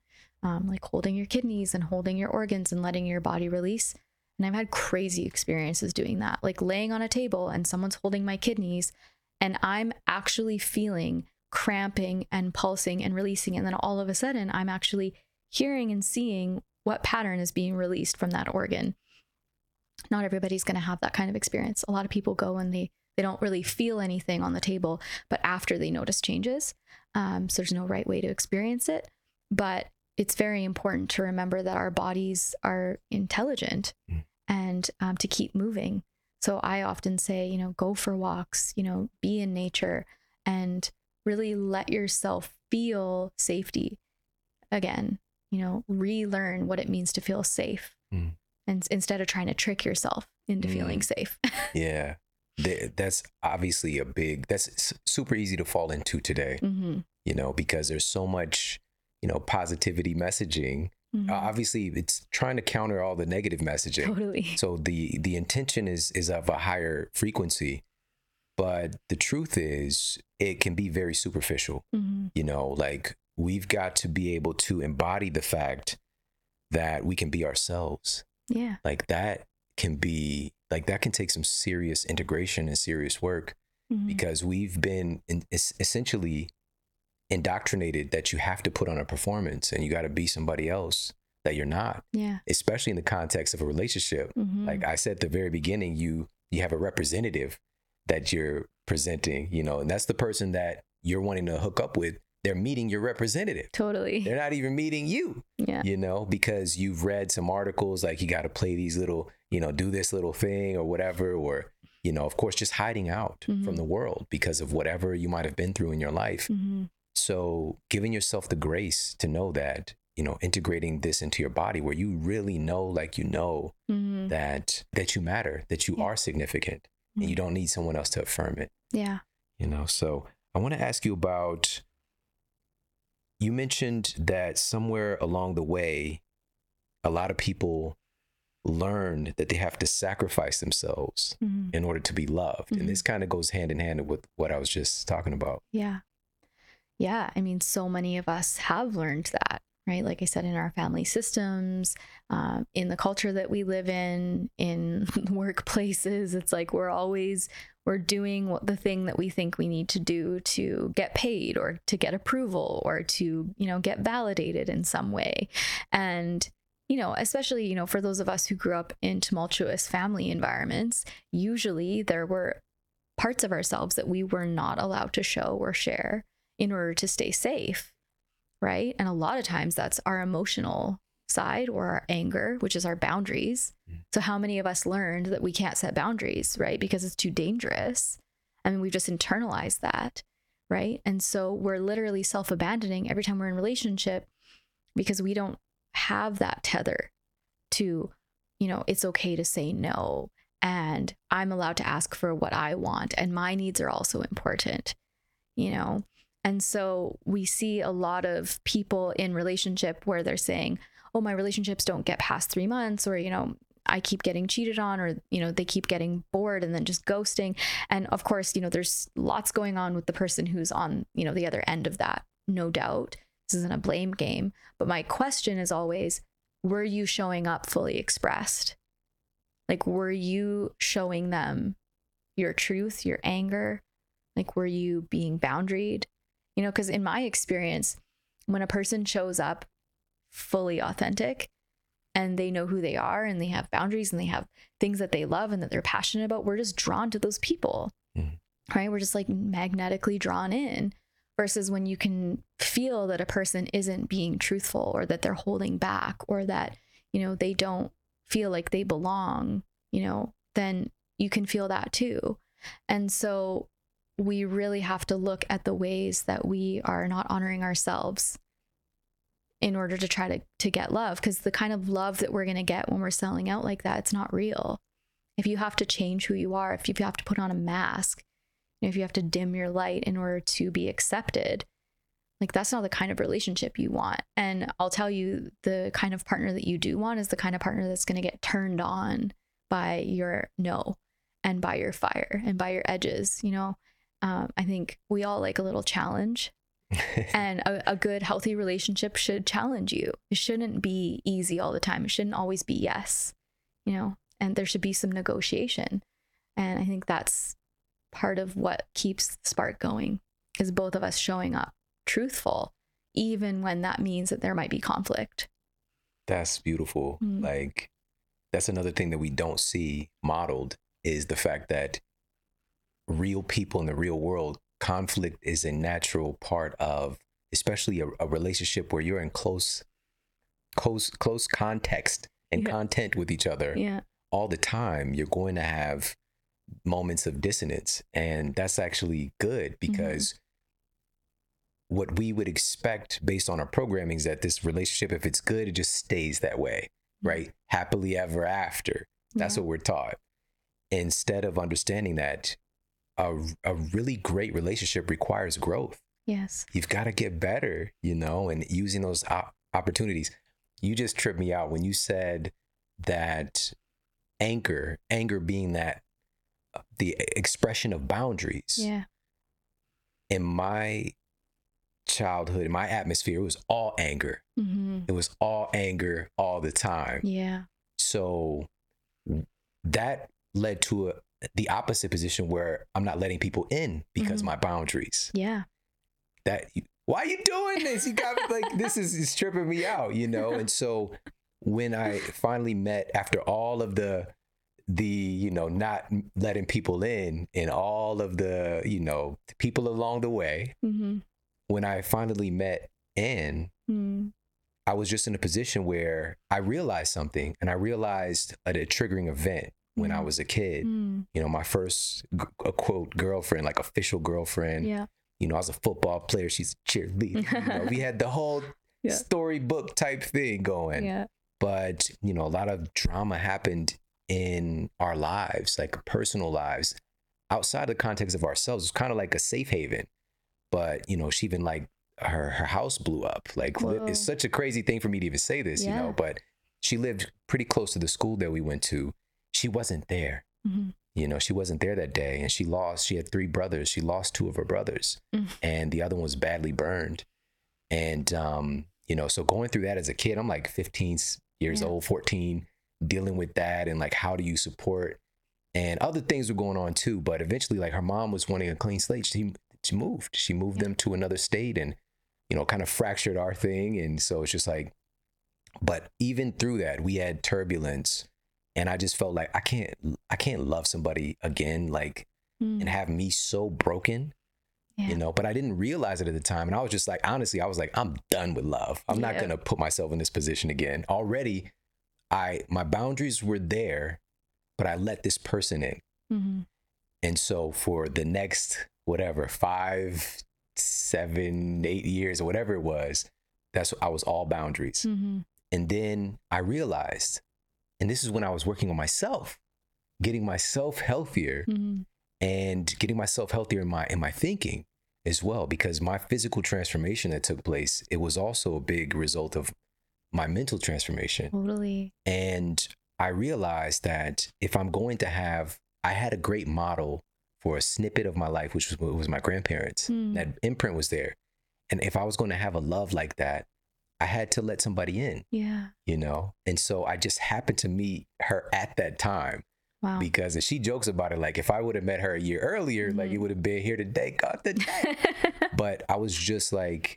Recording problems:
squashed, flat; heavily

